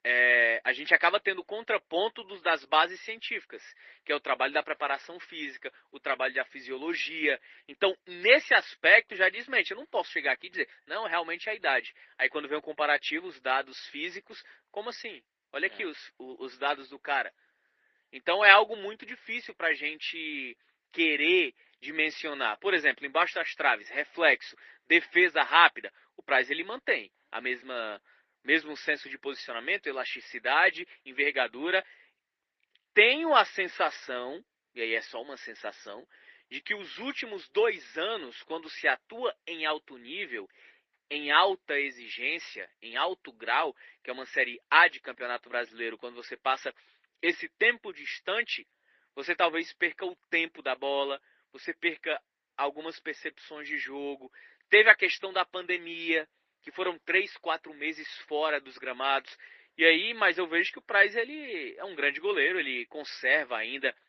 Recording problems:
thin; very; fading below 350 Hz
garbled, watery; slightly

